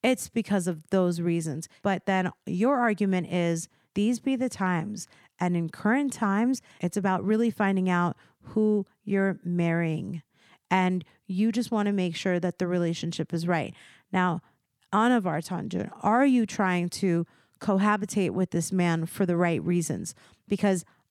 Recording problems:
none

